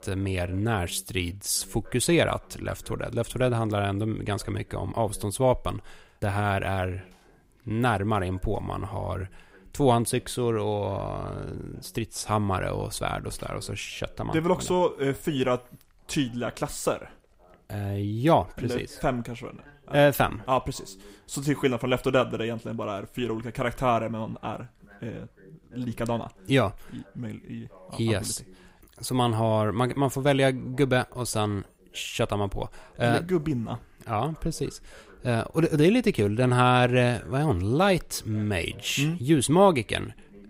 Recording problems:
voice in the background; faint; throughout; 30 dB below the speech

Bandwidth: 15.5 kHz